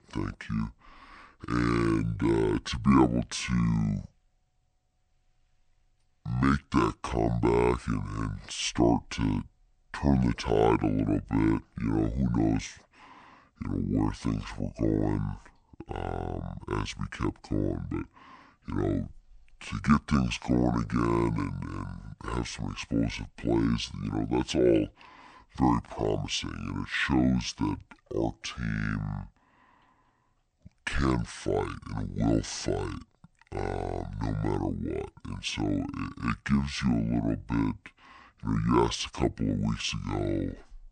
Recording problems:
wrong speed and pitch; too slow and too low; 0.6 times normal speed

